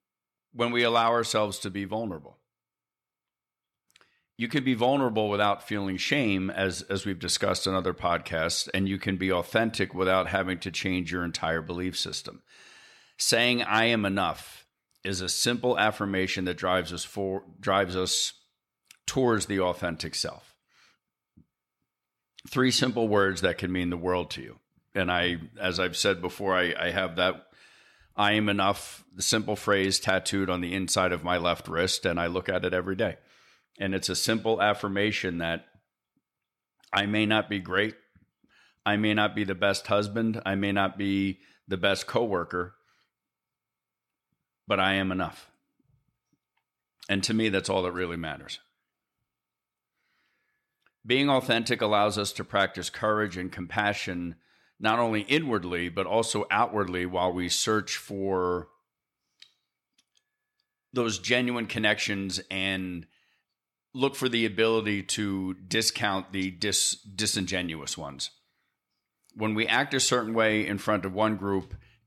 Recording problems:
none

